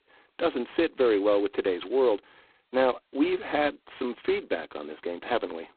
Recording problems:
phone-call audio; poor line; nothing above 4 kHz

